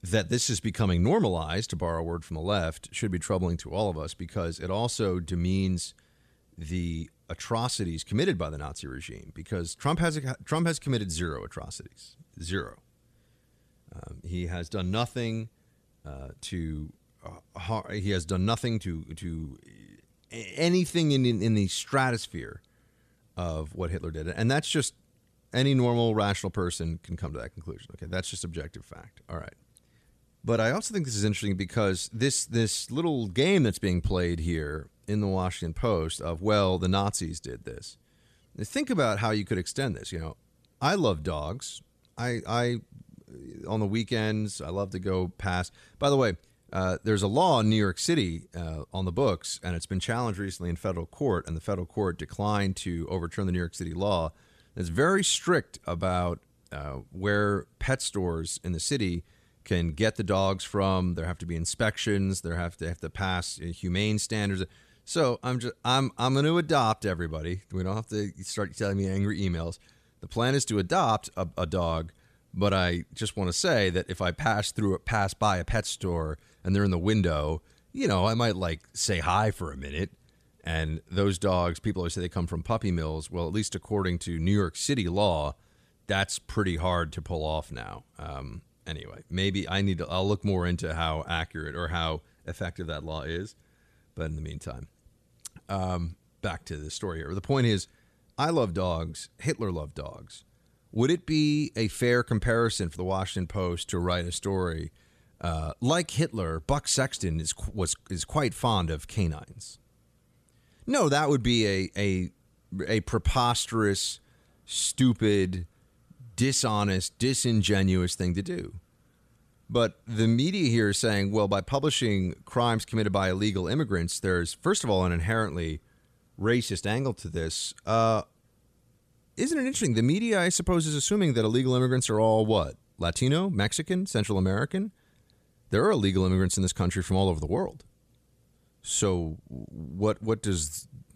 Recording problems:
none

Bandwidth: 14.5 kHz